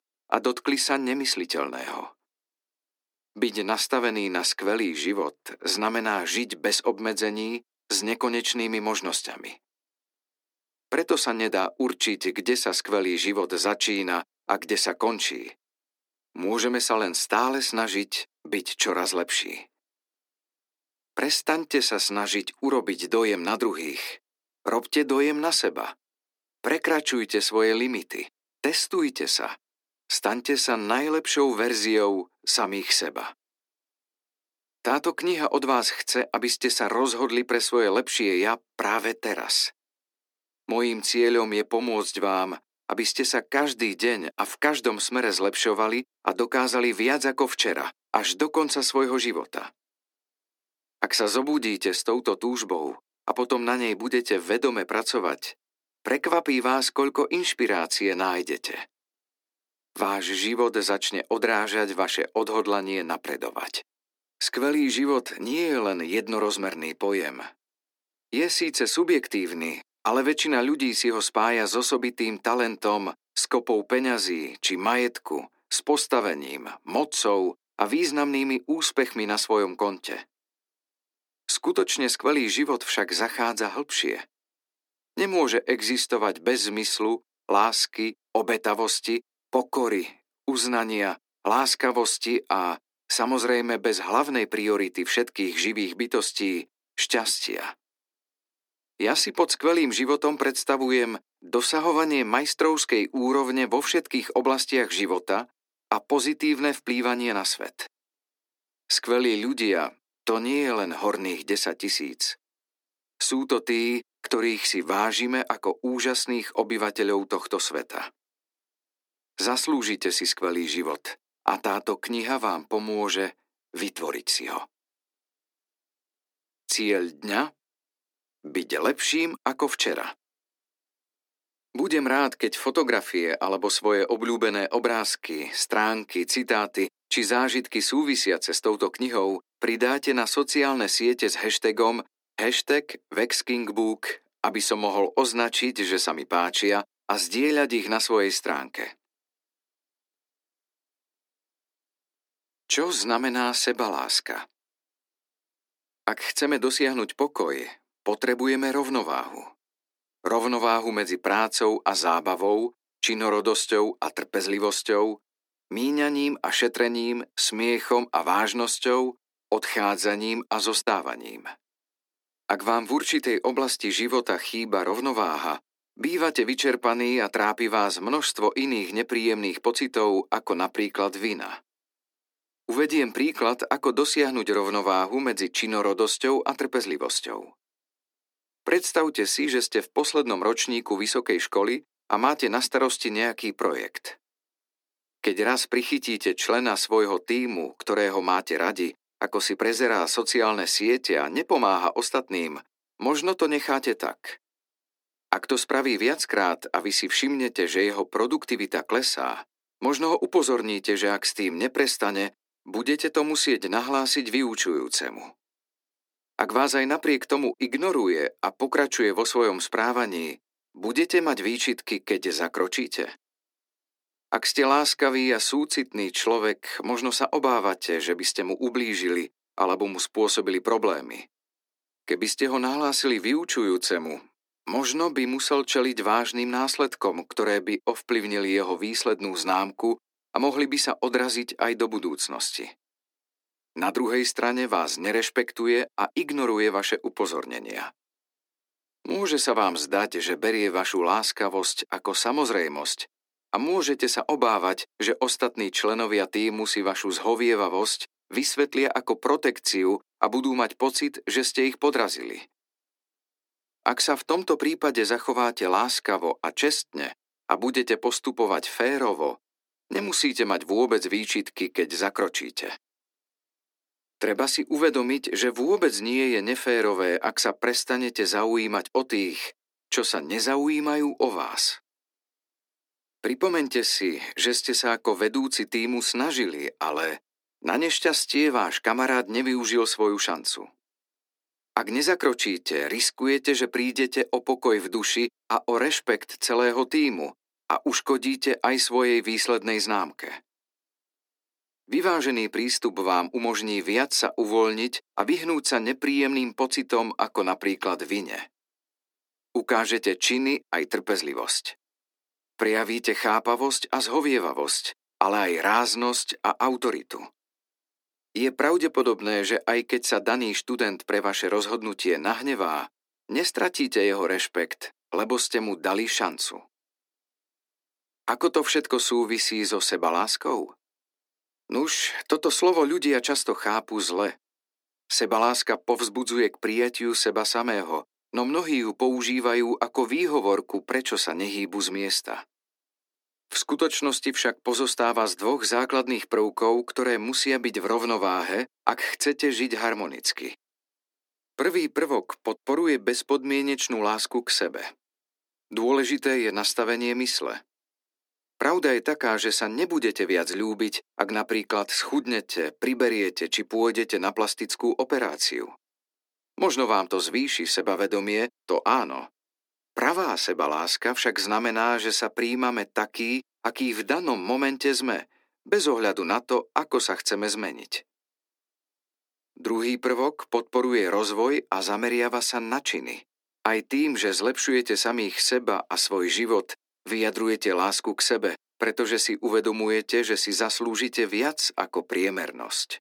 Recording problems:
thin; somewhat; fading below 300 Hz

